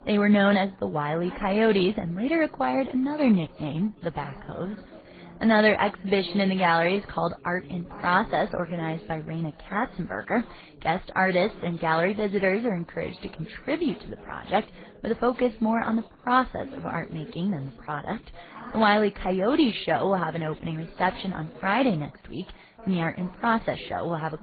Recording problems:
garbled, watery; badly
high frequencies cut off; severe; nothing above 4.5 kHz
background chatter; faint; throughout; 3 voices, 20 dB below the speech

